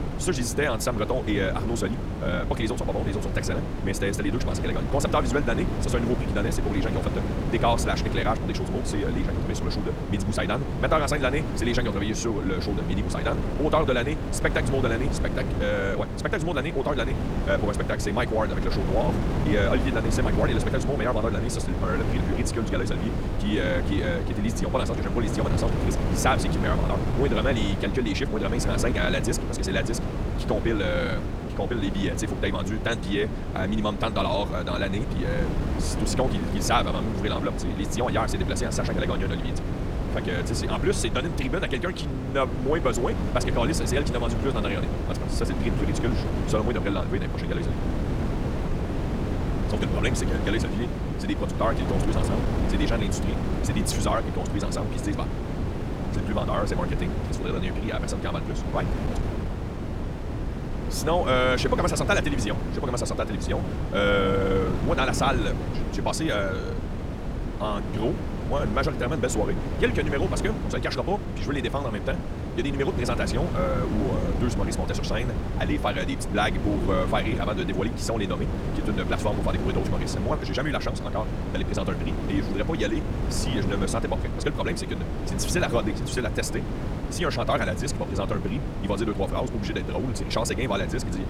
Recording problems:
wrong speed, natural pitch; too fast; 1.6 times normal speed
wind noise on the microphone; heavy; 6 dB below the speech

